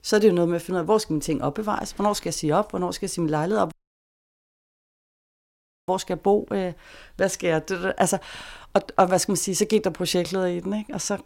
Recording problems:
audio cutting out; at 3.5 s for 2 s

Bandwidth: 16 kHz